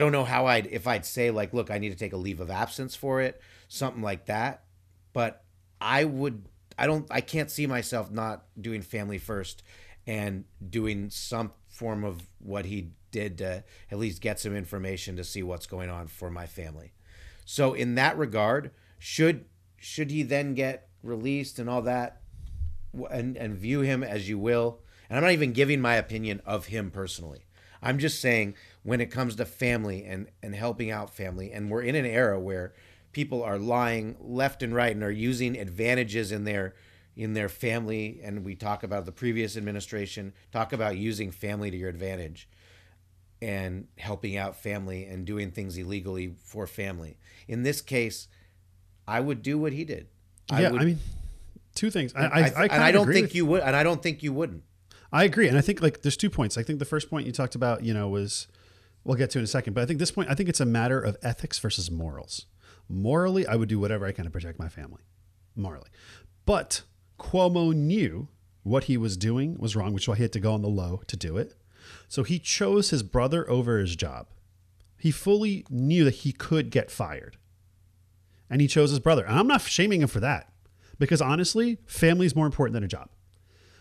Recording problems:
abrupt cut into speech; at the start

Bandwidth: 14 kHz